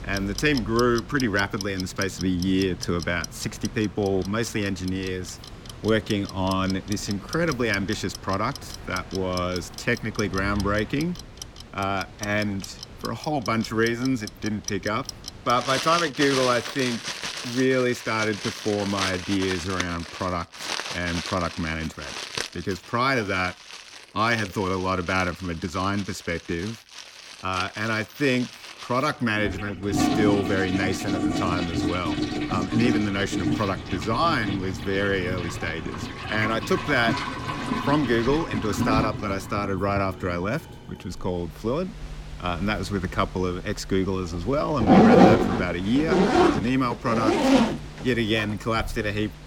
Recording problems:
household noises; loud; throughout; 2 dB below the speech

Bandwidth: 17.5 kHz